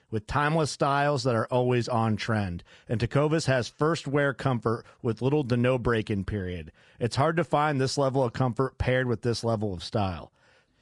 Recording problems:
garbled, watery; slightly; nothing above 10 kHz

